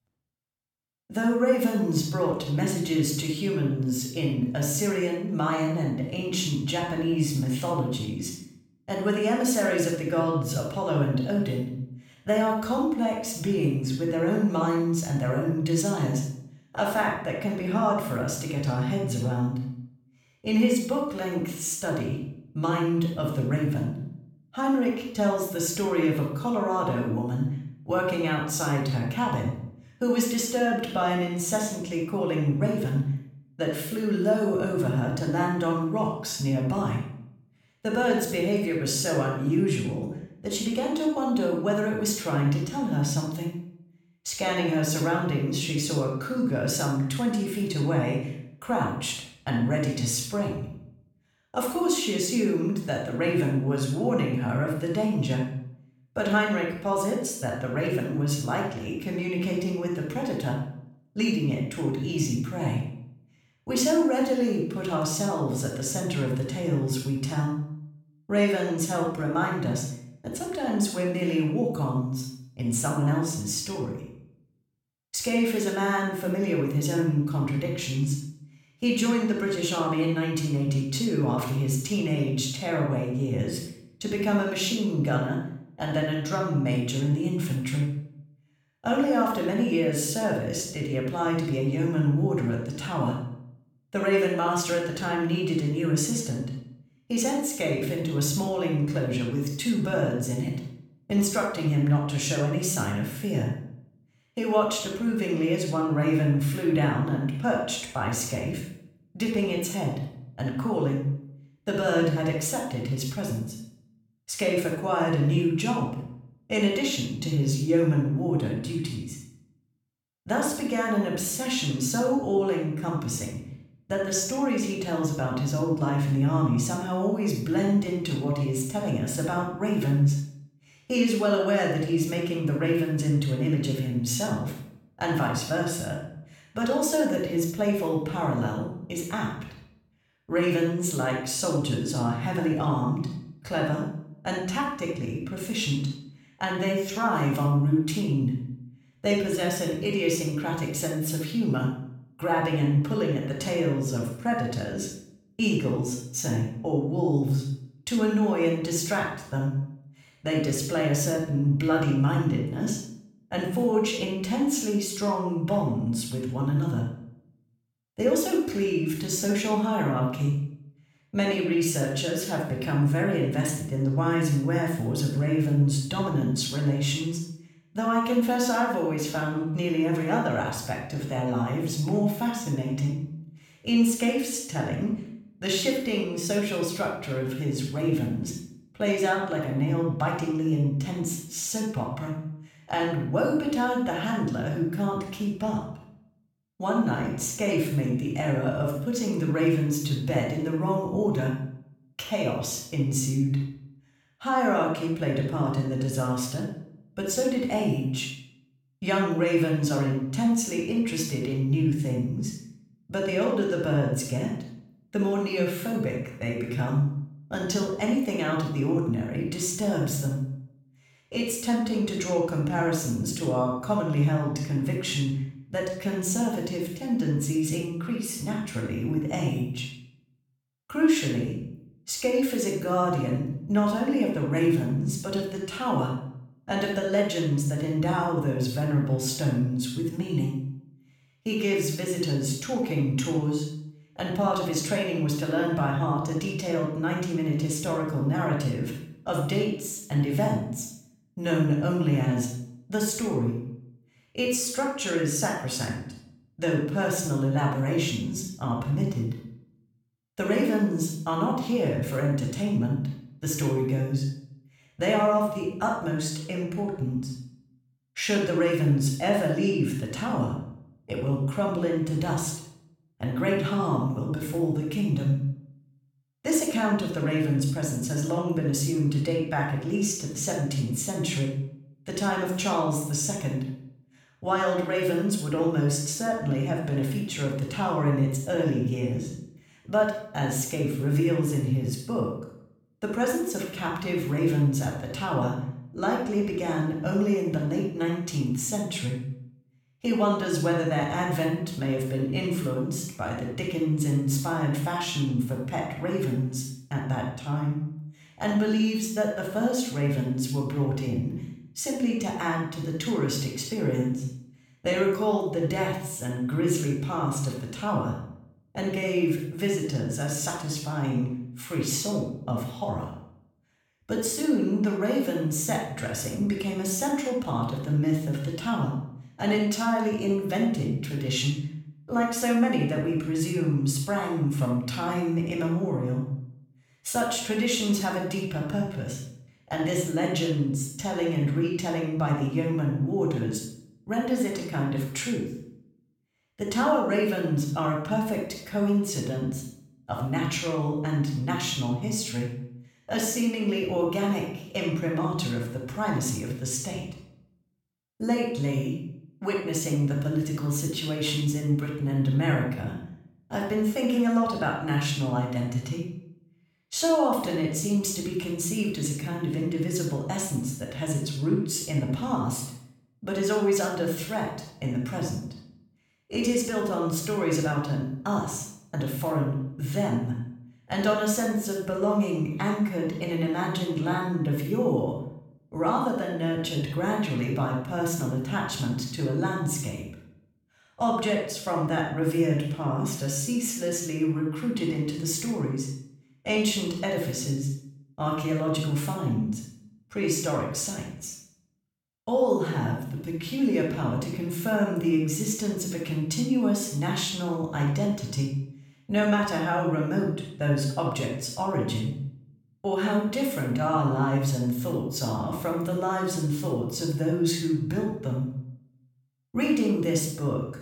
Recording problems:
room echo; noticeable; dies away in 0.6 s
off-mic speech; somewhat distant

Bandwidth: 17 kHz